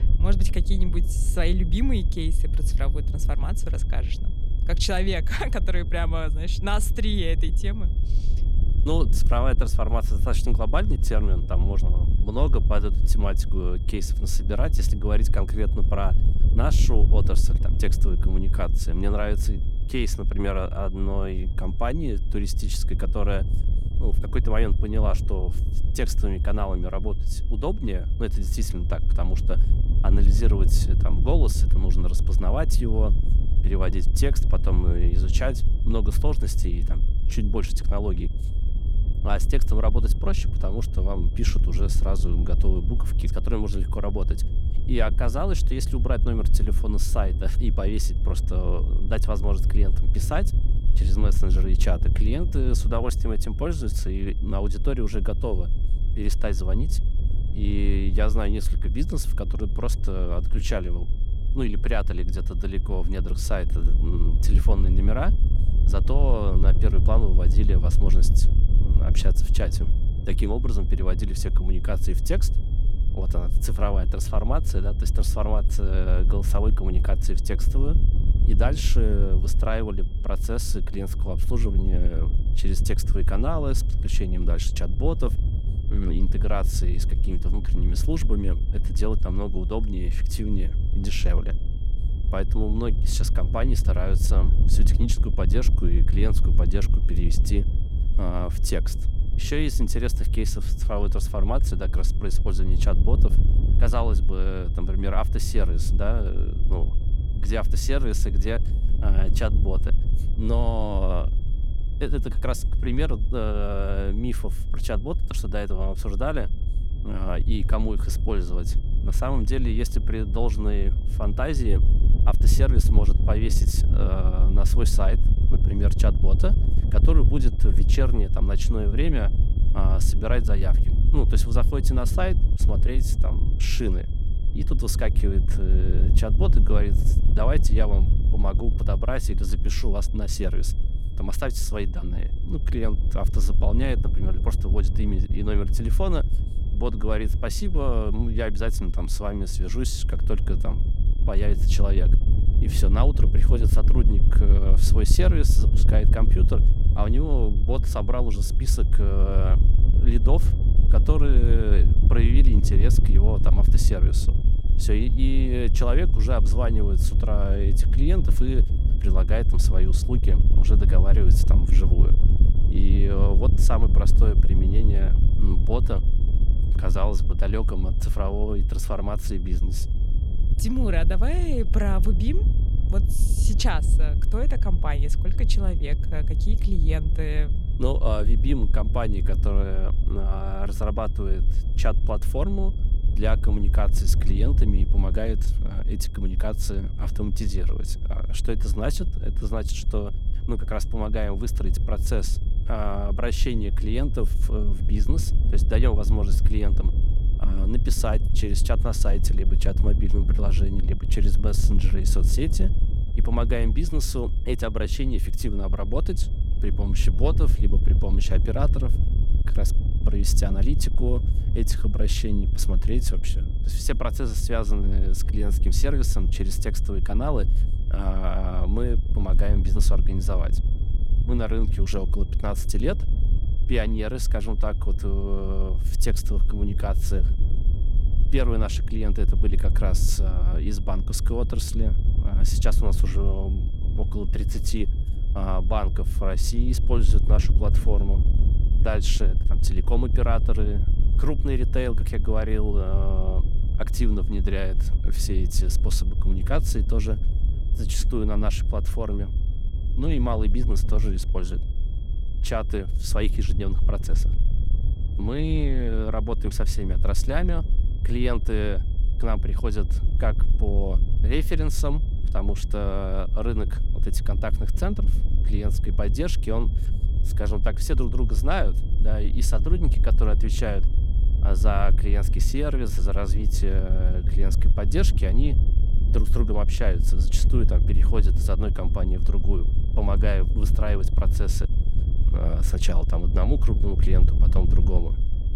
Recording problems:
wind noise on the microphone; heavy; 10 dB below the speech
high-pitched whine; faint; throughout; 3.5 kHz, 25 dB below the speech

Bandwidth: 17.5 kHz